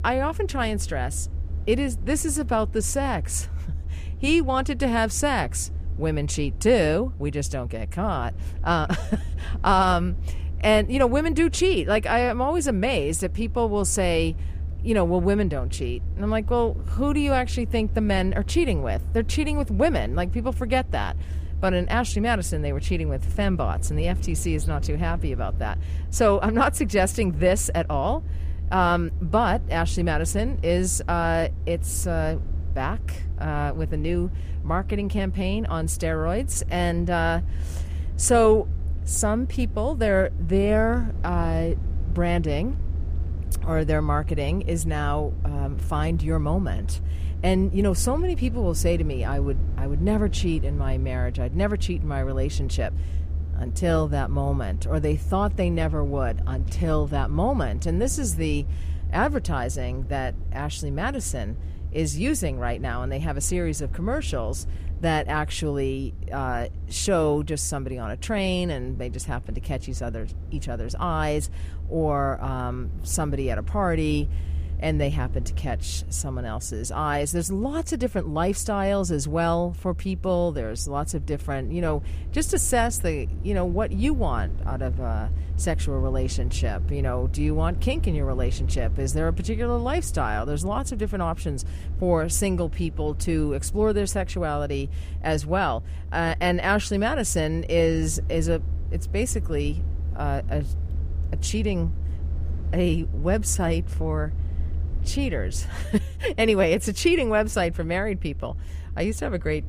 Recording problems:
low rumble; faint; throughout; 20 dB below the speech

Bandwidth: 15 kHz